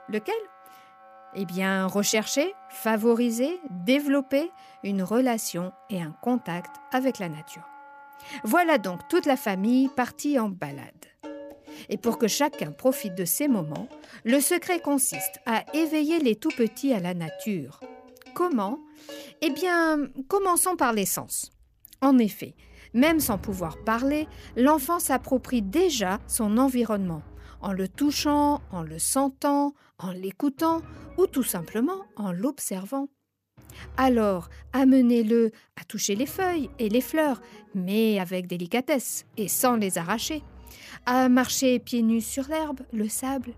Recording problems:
background music; faint; throughout; 20 dB below the speech

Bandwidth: 14.5 kHz